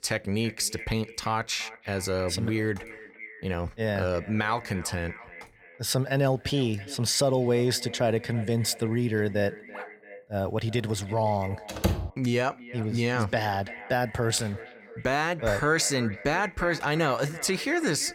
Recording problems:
echo of what is said; noticeable; throughout; 340 ms later, 15 dB below the speech
dog barking; faint; at 9.5 s; peak 15 dB below the speech
door banging; noticeable; at 12 s; peak 1 dB below the speech

